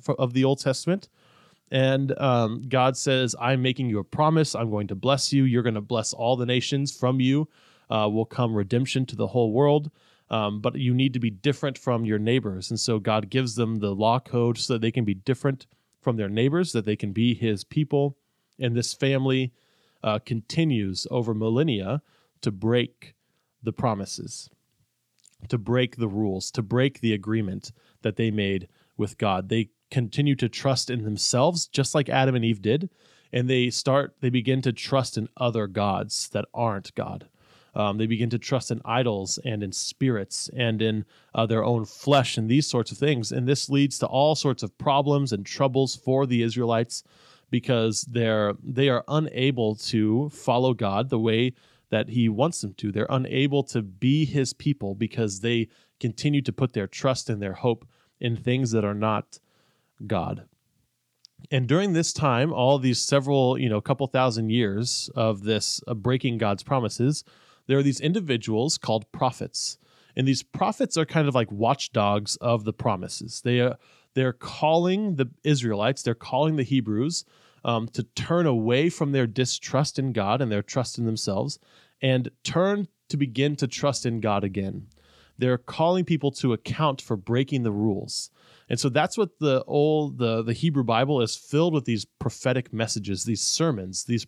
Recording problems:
none

